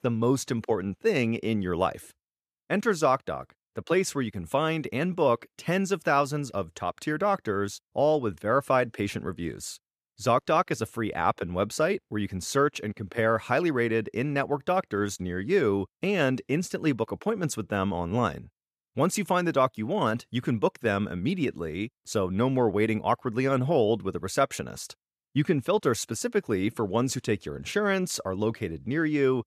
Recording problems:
none

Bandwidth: 14.5 kHz